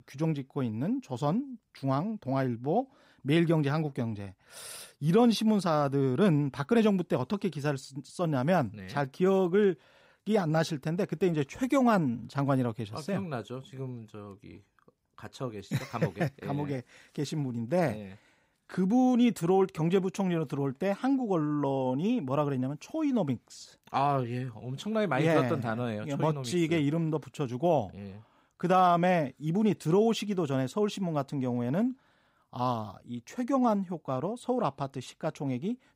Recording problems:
none

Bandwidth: 15.5 kHz